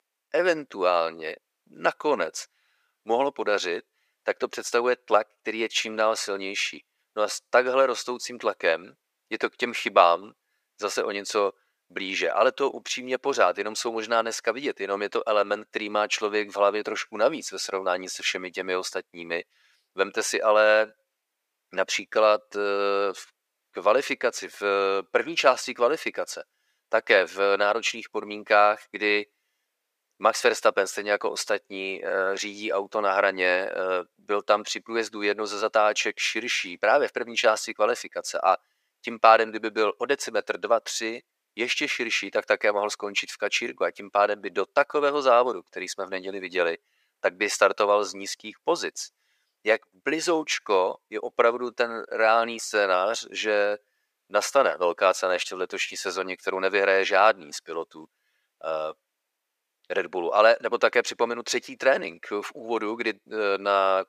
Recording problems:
thin; very; fading below 450 Hz

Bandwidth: 15 kHz